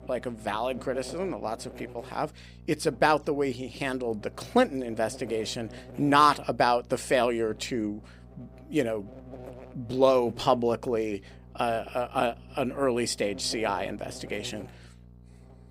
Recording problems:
electrical hum; faint; throughout; 60 Hz, 25 dB below the speech

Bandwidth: 15.5 kHz